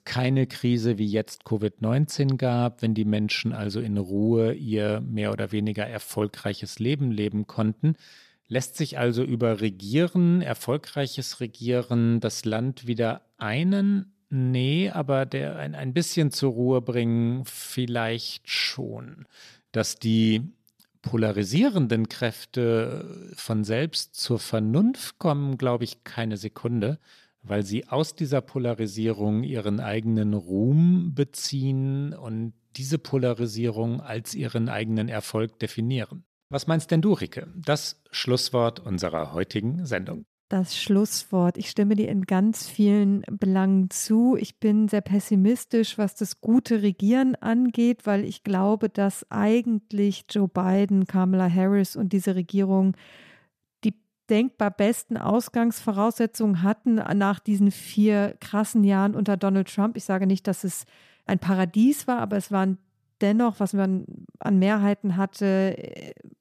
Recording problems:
none

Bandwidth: 14.5 kHz